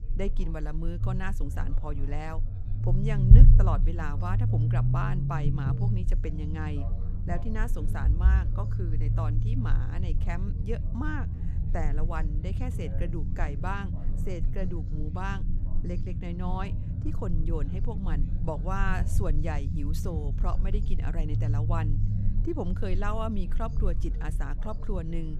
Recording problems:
low rumble; loud; throughout; 5 dB below the speech
background chatter; faint; throughout; 4 voices, 20 dB below the speech

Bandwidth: 14.5 kHz